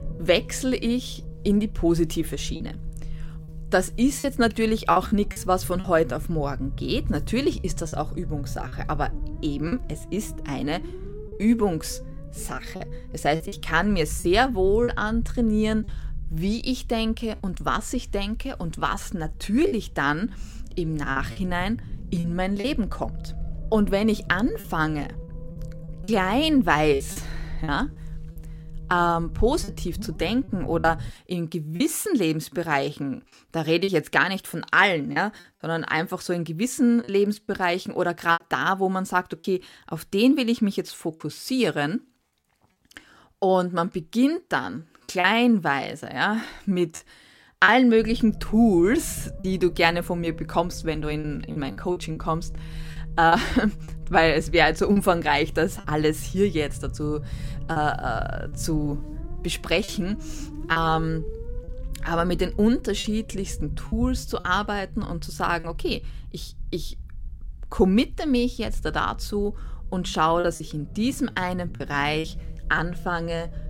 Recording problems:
low rumble; faint; until 31 s and from 48 s on; 25 dB below the speech
choppy; occasionally; 4% of the speech affected

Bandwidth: 16.5 kHz